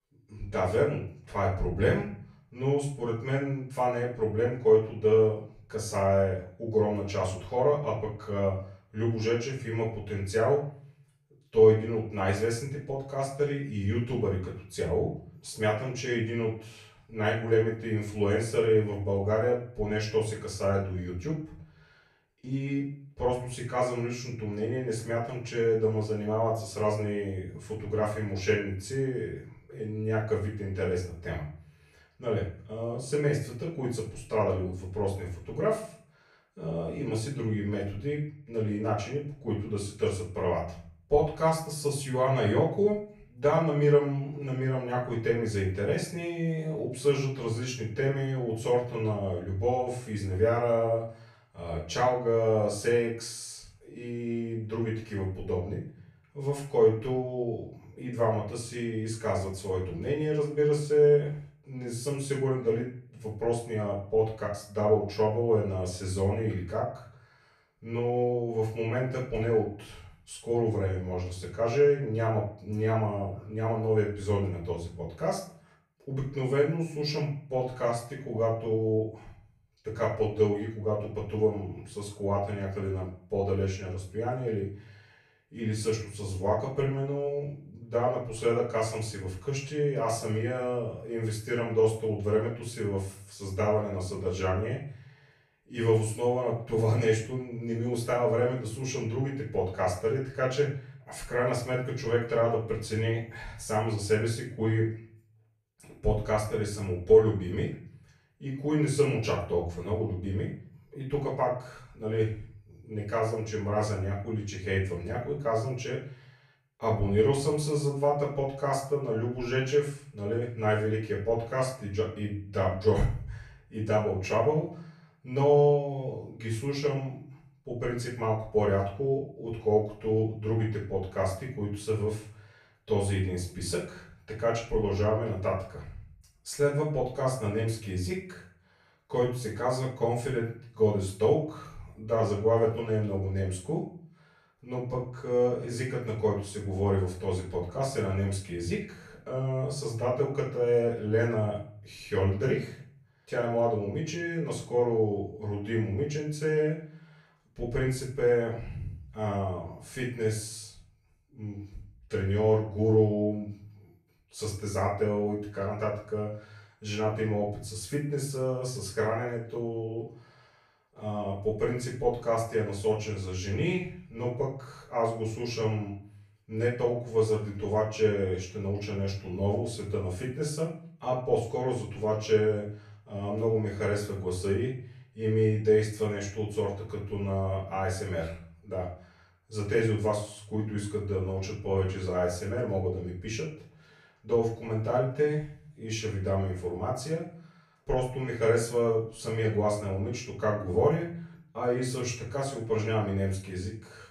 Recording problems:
off-mic speech; far
room echo; noticeable; dies away in 0.4 s

